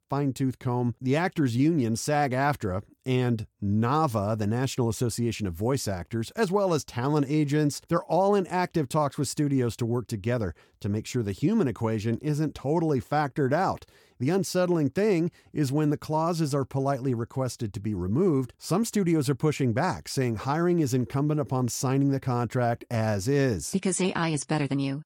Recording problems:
none

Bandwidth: 18.5 kHz